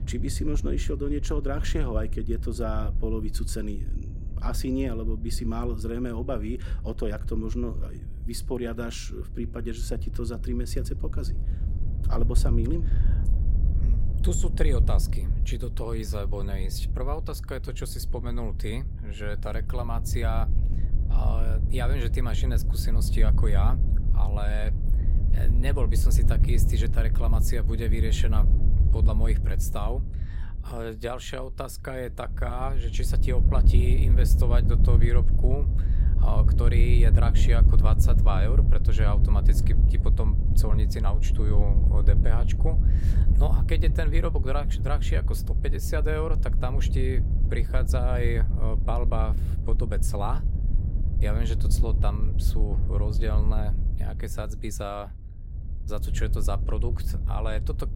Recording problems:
wind noise on the microphone; heavy; 8 dB below the speech

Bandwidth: 16 kHz